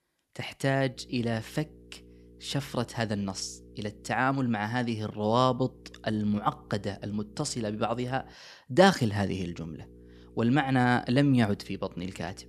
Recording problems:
electrical hum; faint; from 1 to 4 s, from 5.5 to 8.5 s and from 9.5 s on; 60 Hz, 30 dB below the speech

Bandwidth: 14 kHz